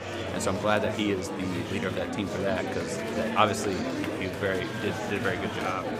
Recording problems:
murmuring crowd; loud; throughout; 2 dB below the speech

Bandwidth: 15.5 kHz